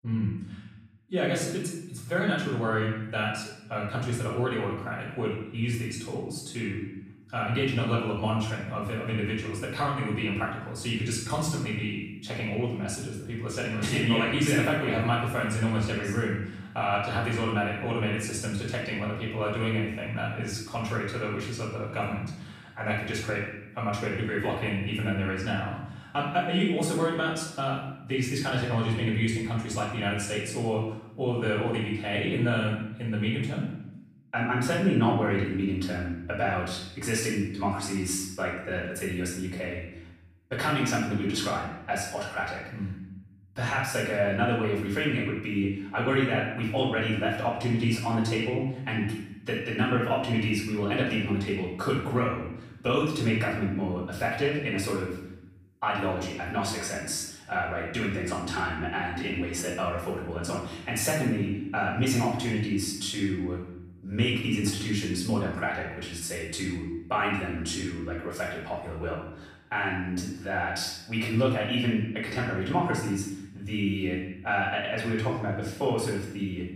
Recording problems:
off-mic speech; far
room echo; noticeable; dies away in 0.8 s

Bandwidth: 15 kHz